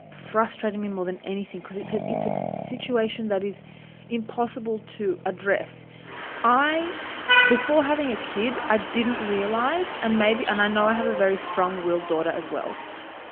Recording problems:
phone-call audio; nothing above 3 kHz
traffic noise; loud; throughout; 2 dB below the speech

